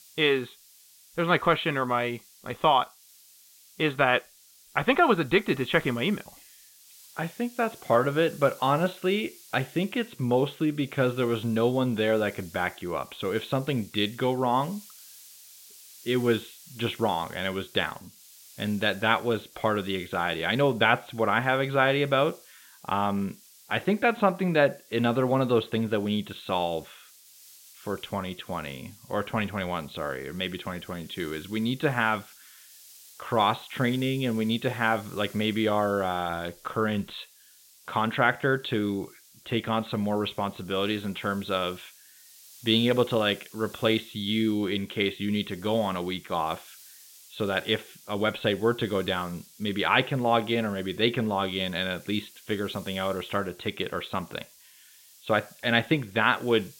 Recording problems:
high frequencies cut off; severe; nothing above 4 kHz
hiss; faint; throughout; 25 dB below the speech

